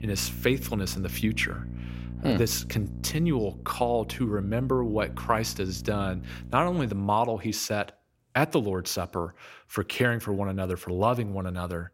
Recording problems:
electrical hum; noticeable; until 7 s; 60 Hz, 20 dB below the speech

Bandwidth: 16 kHz